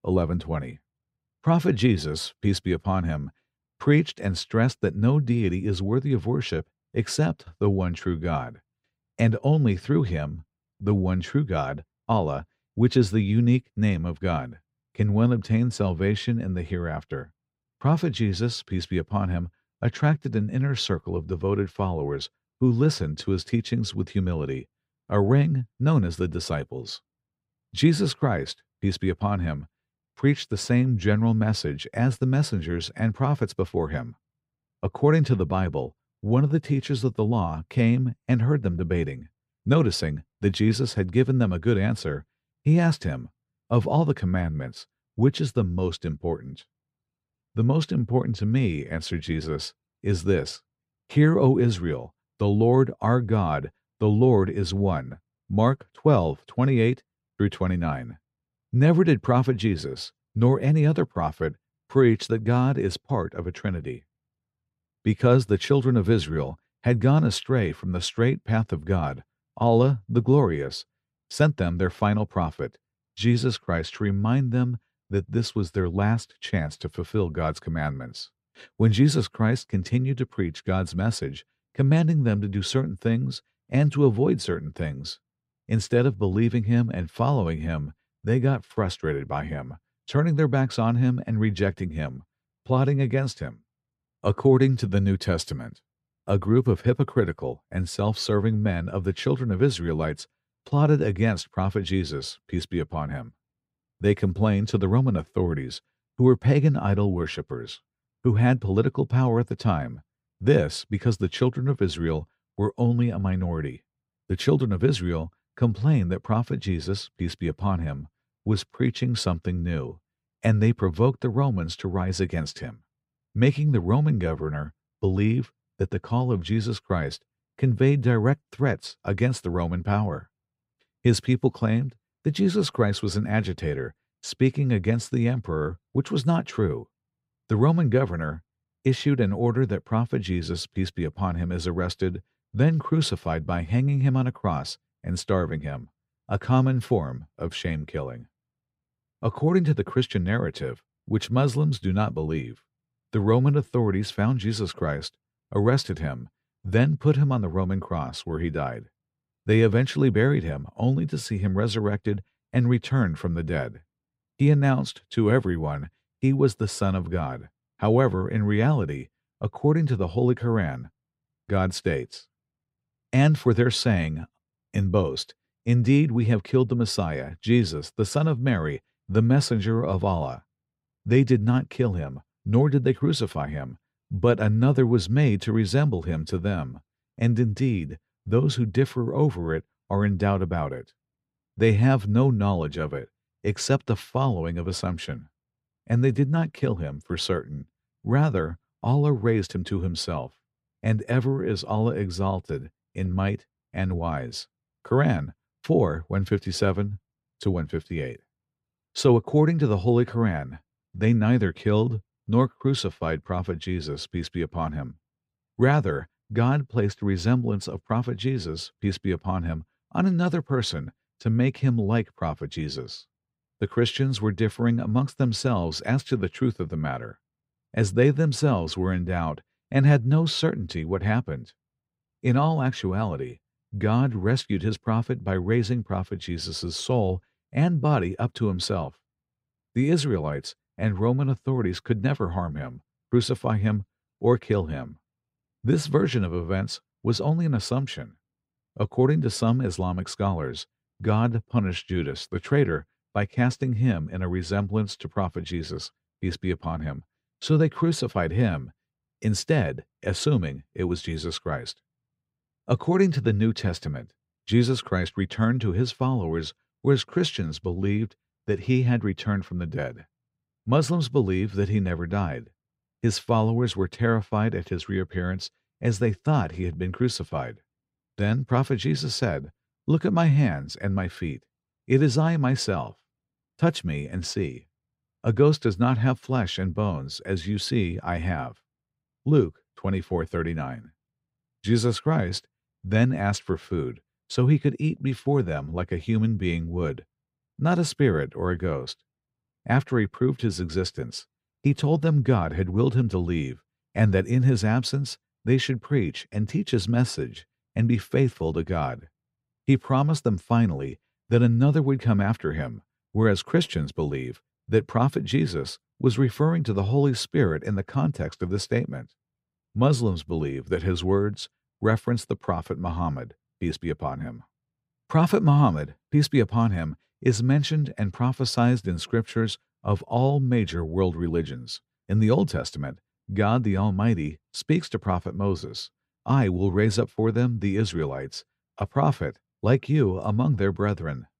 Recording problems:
none

